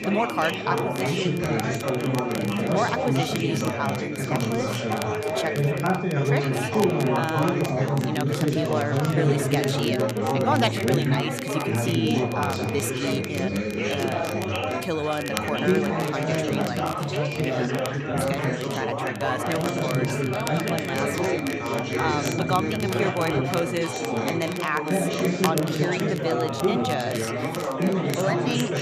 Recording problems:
chatter from many people; very loud; throughout; 4 dB above the speech
high-pitched whine; loud; until 8 s, from 11 to 16 s and from 20 to 26 s; 2.5 kHz, 10 dB below the speech
crackle, like an old record; noticeable; 10 dB below the speech

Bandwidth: 14.5 kHz